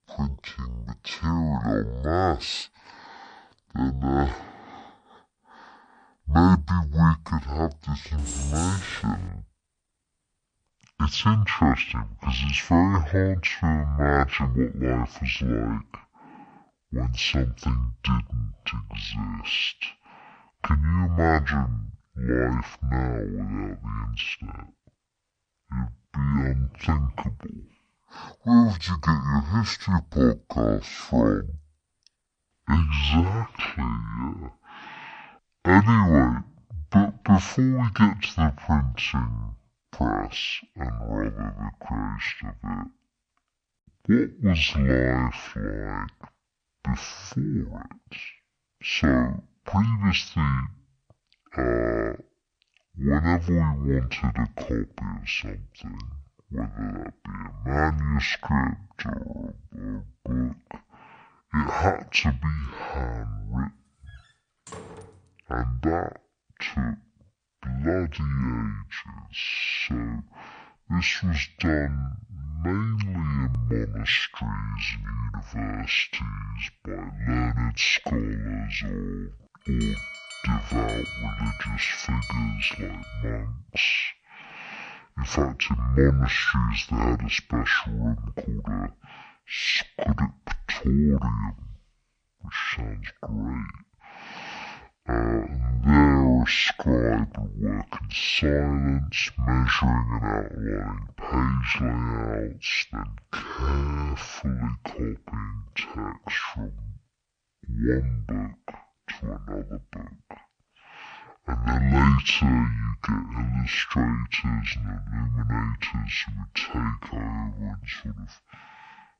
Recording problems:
wrong speed and pitch; too slow and too low; 0.5 times normal speed
jangling keys; noticeable; from 8 to 9.5 s; peak 6 dB below the speech
door banging; faint; from 1:04 to 1:05; peak 15 dB below the speech
alarm; noticeable; from 1:20 to 1:23; peak 8 dB below the speech

